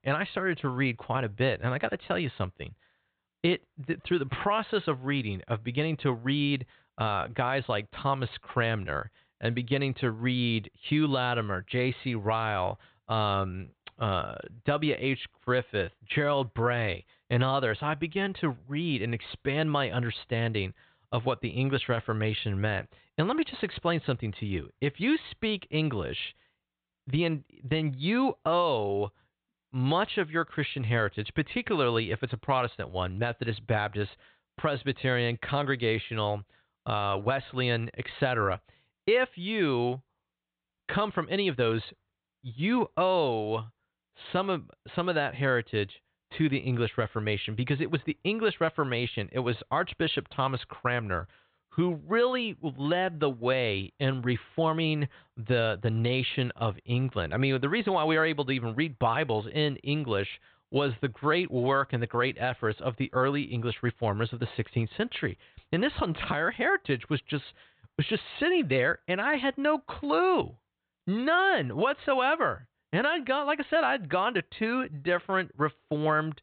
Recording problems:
high frequencies cut off; severe; nothing above 4 kHz

